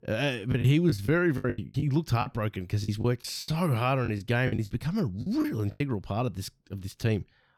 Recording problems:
choppy; very; from 0.5 to 2.5 s, at 3 s and from 4 to 6 s; 18% of the speech affected

